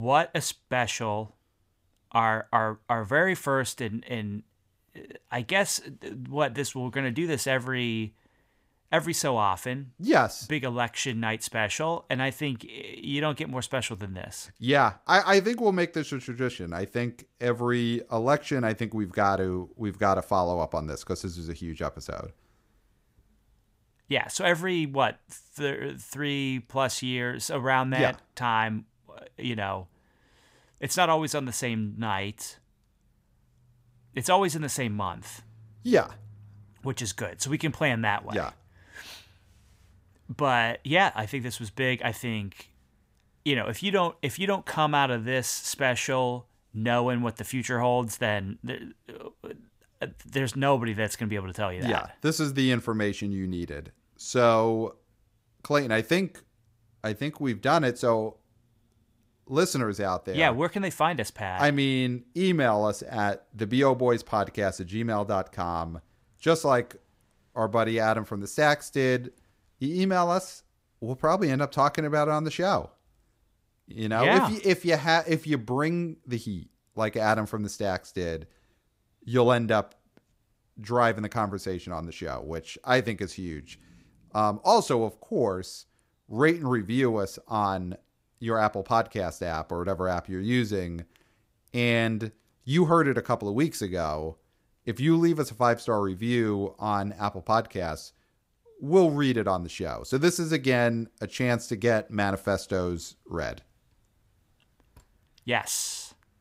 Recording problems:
abrupt cut into speech; at the start

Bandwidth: 15.5 kHz